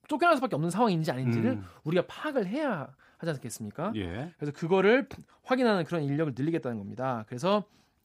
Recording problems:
none

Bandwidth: 15.5 kHz